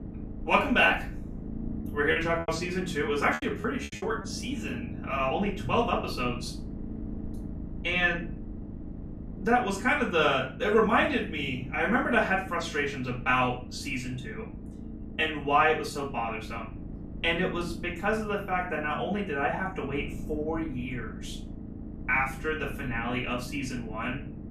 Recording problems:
off-mic speech; far
room echo; slight; dies away in 0.4 s
low rumble; noticeable; throughout; 20 dB below the speech
choppy; very; from 1 to 4 s; 14% of the speech affected

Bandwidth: 14 kHz